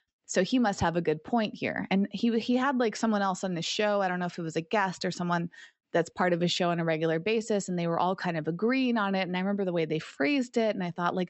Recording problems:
high frequencies cut off; noticeable; nothing above 8 kHz

